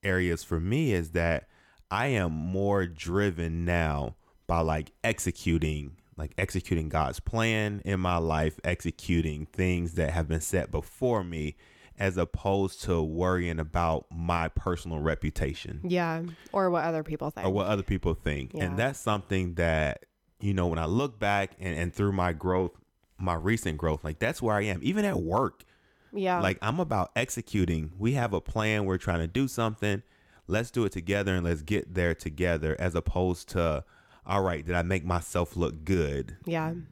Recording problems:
none

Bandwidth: 18 kHz